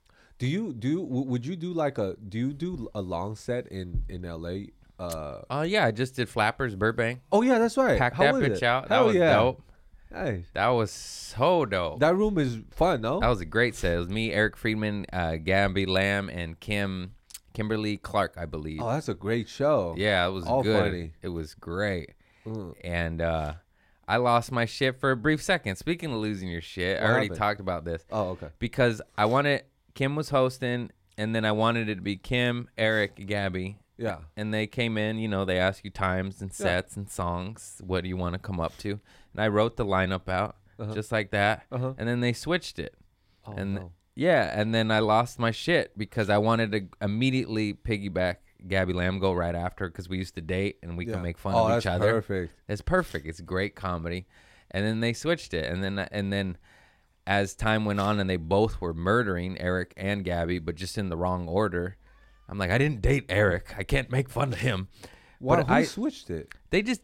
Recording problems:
none

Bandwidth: 16 kHz